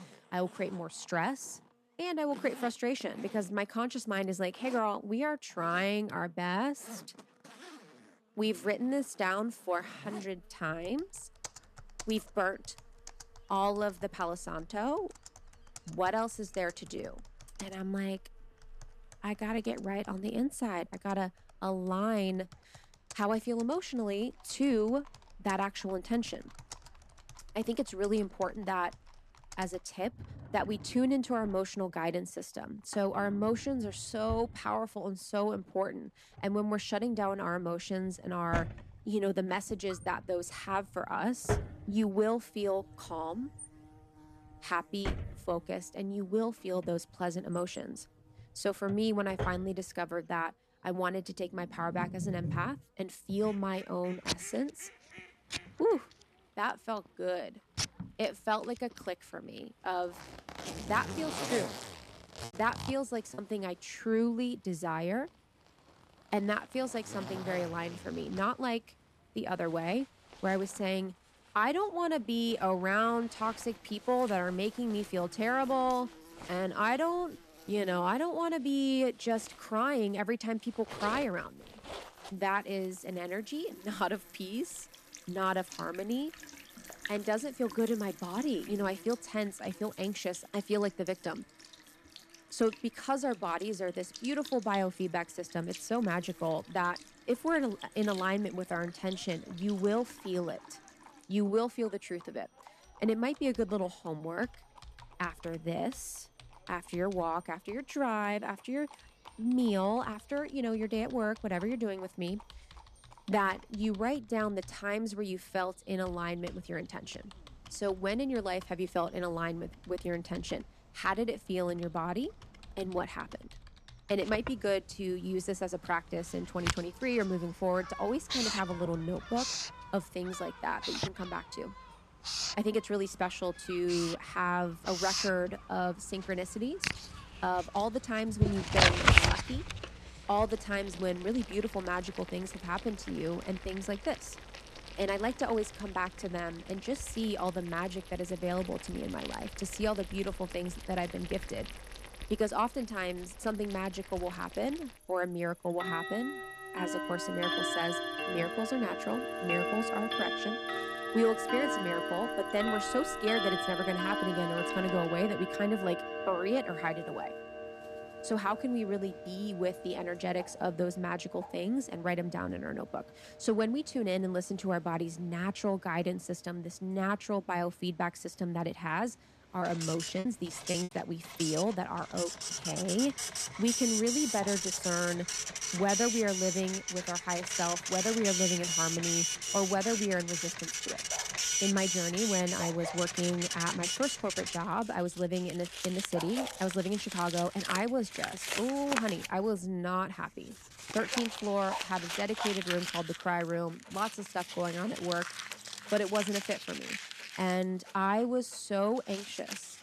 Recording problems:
household noises; loud; throughout; 2 dB below the speech
animal sounds; faint; throughout; 20 dB below the speech
choppy; occasionally; at 1:03 and from 3:00 to 3:01; 4% of the speech affected

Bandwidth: 14 kHz